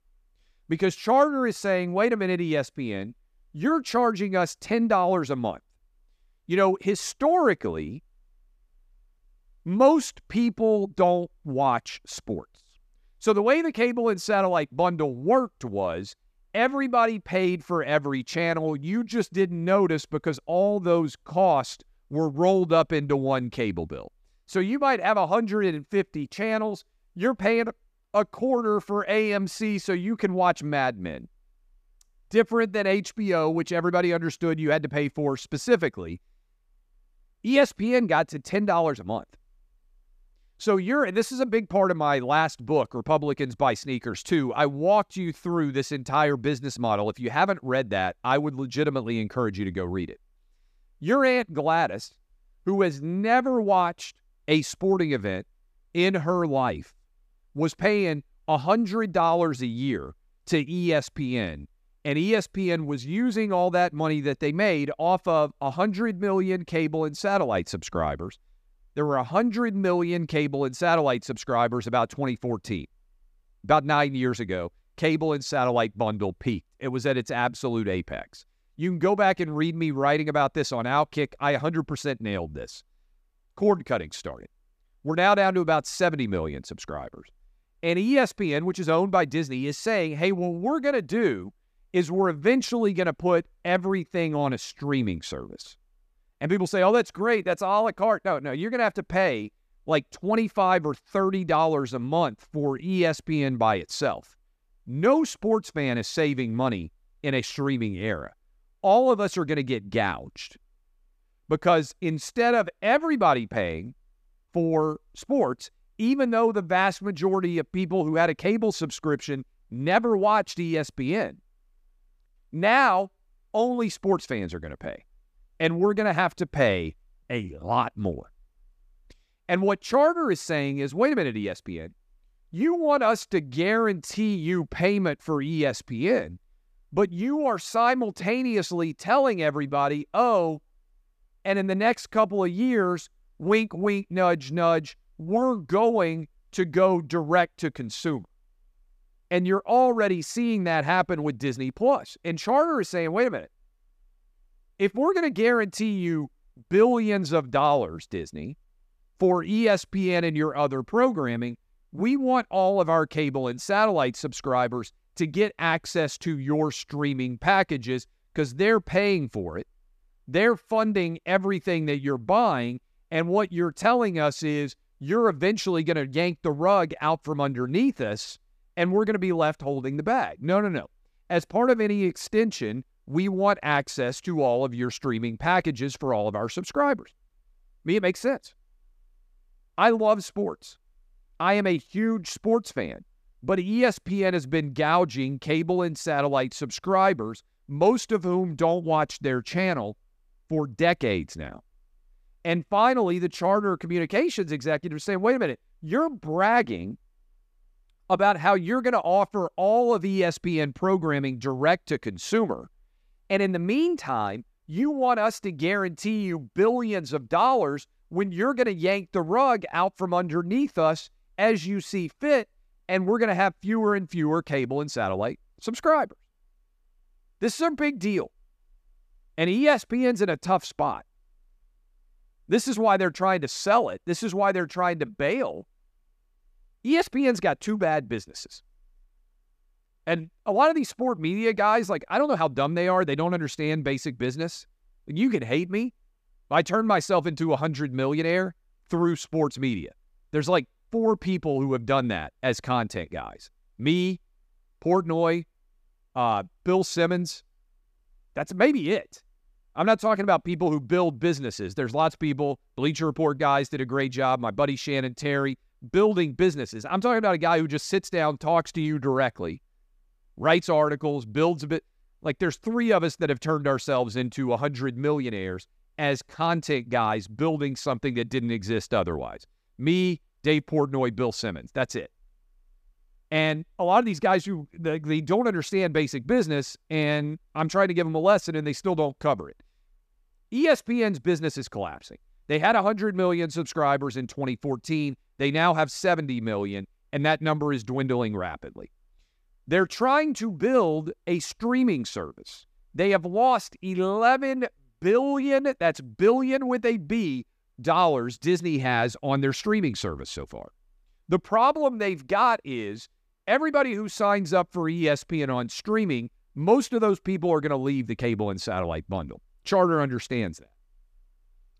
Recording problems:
none

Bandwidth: 14.5 kHz